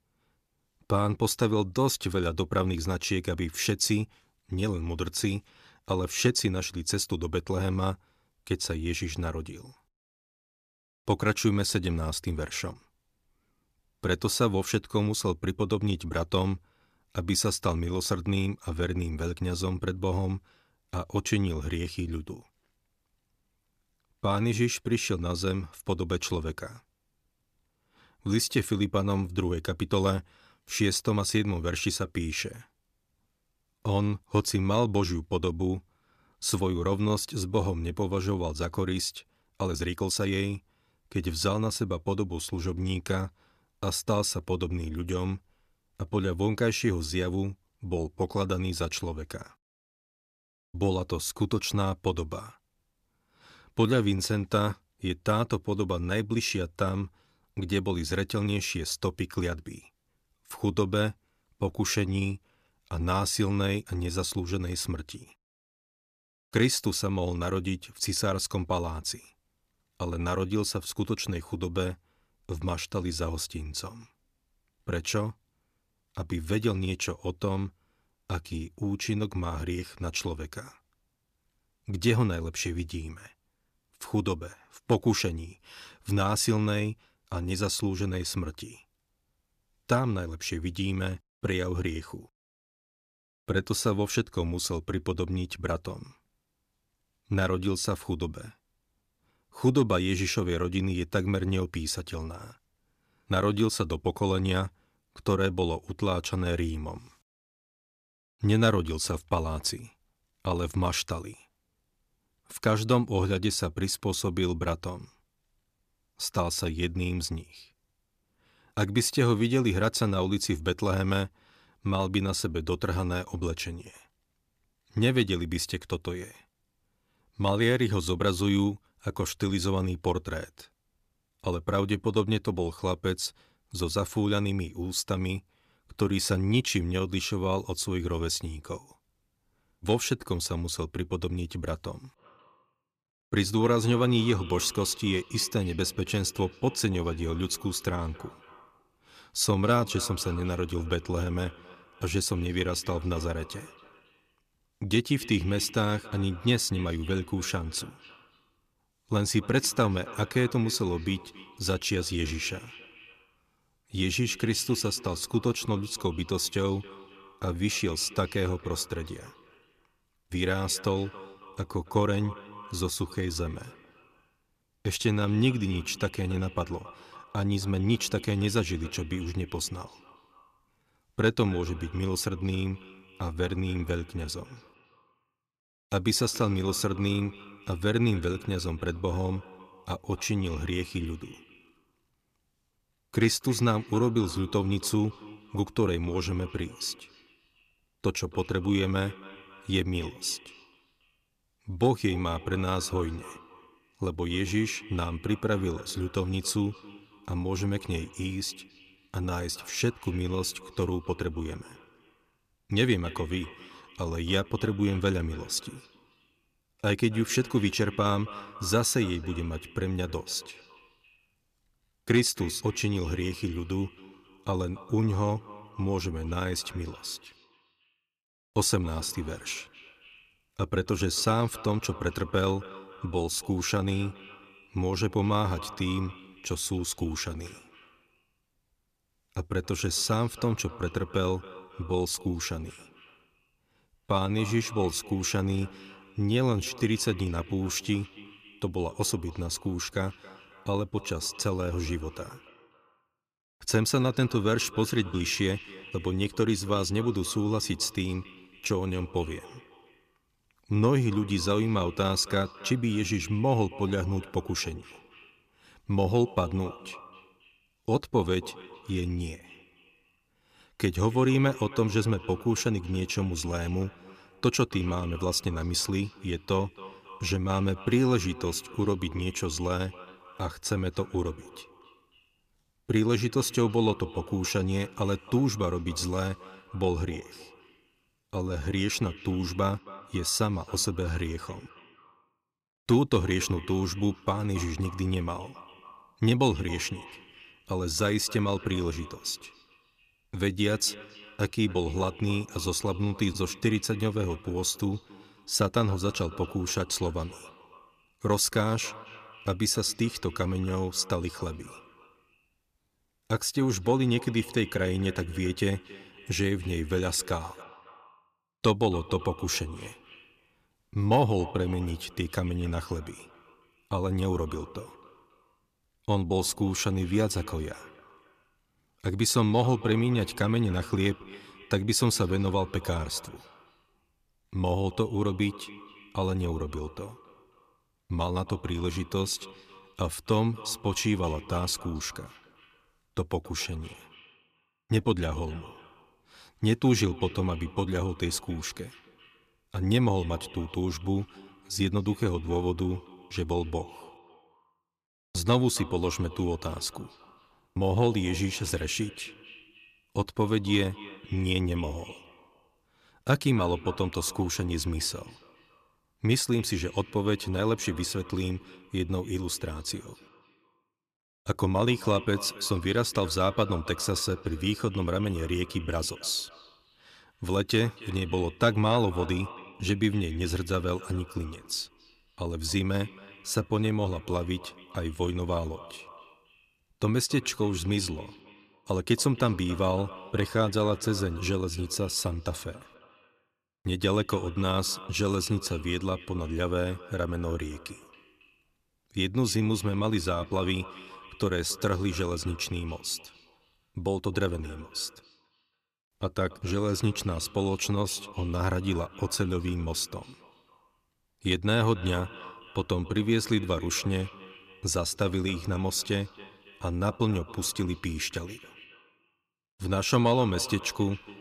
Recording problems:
echo of what is said; faint; from 2:22 on; 270 ms later, 20 dB below the speech
uneven, jittery; strongly; from 28 s to 4:49

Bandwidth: 14.5 kHz